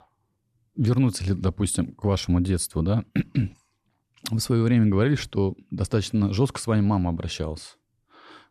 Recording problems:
none

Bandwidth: 13.5 kHz